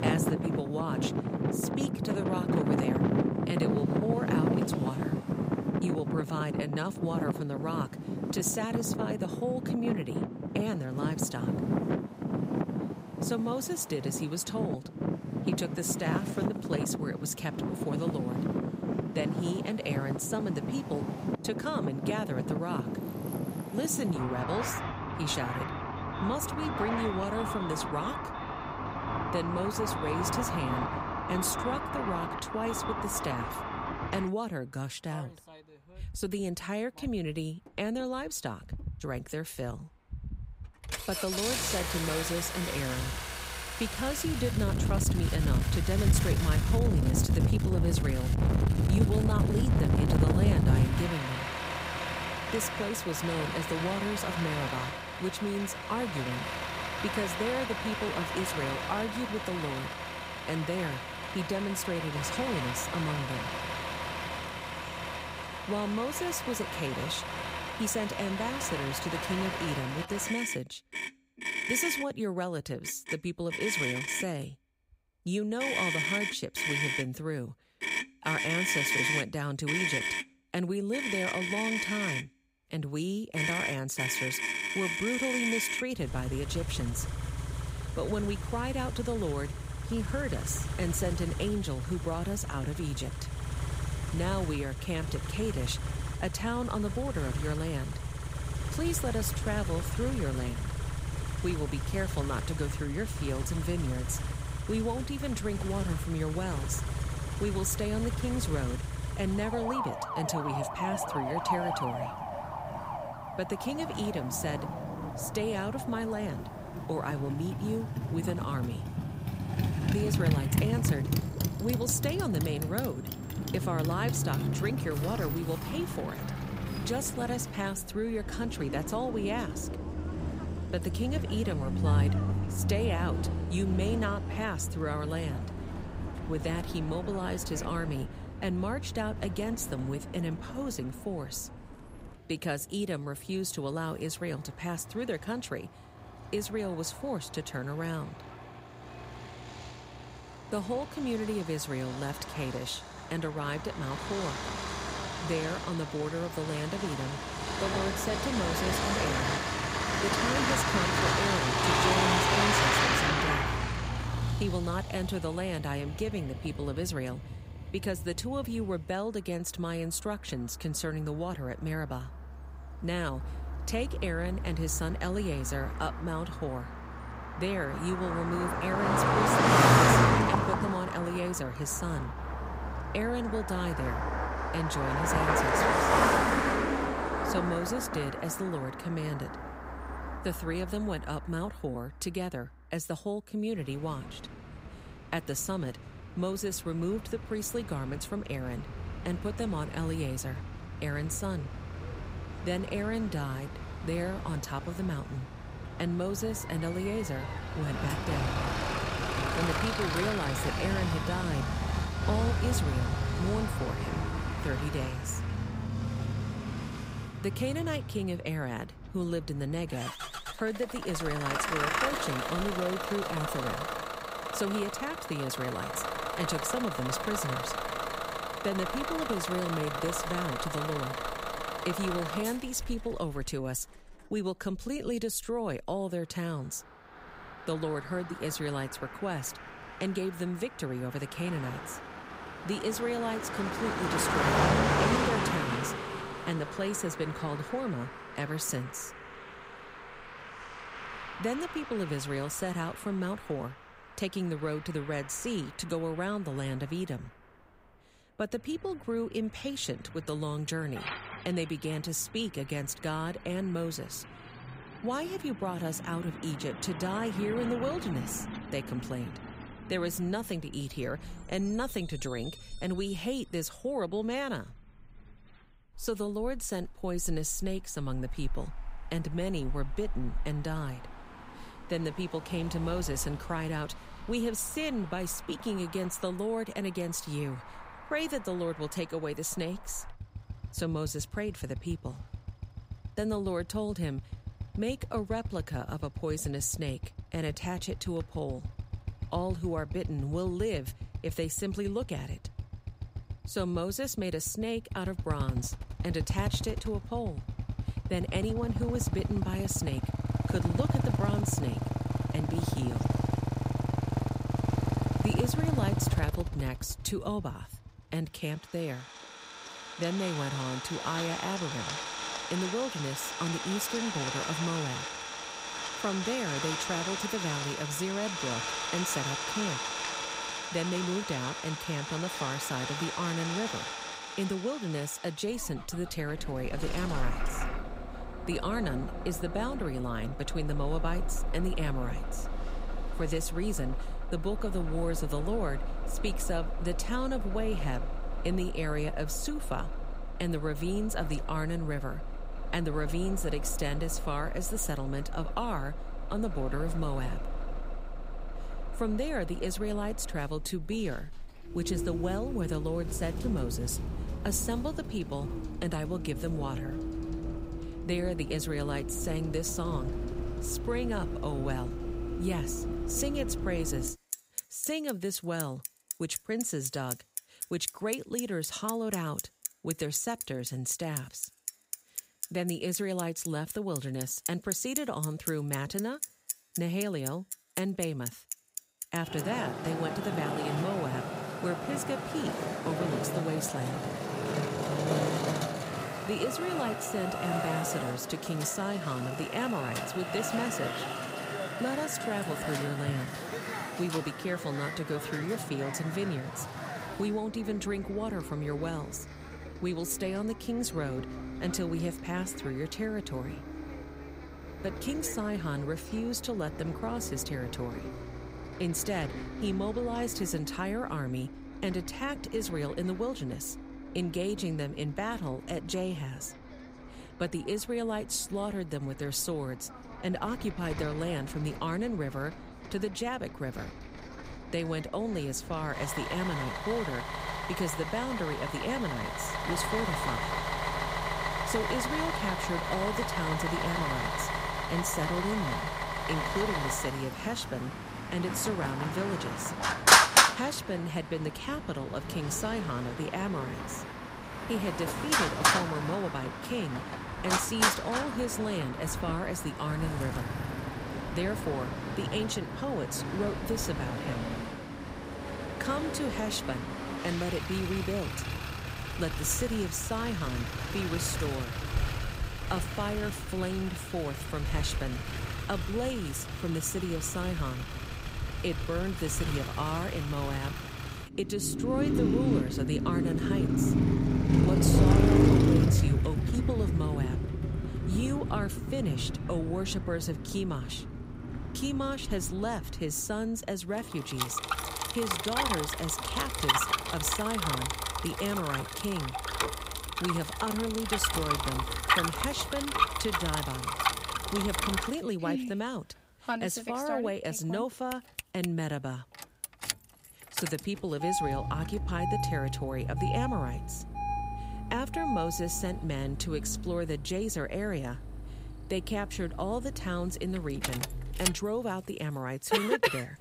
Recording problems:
traffic noise; very loud; throughout; 1 dB above the speech

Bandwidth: 15.5 kHz